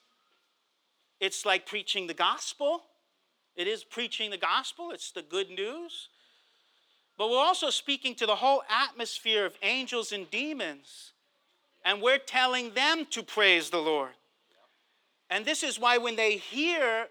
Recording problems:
thin; somewhat; fading below 350 Hz

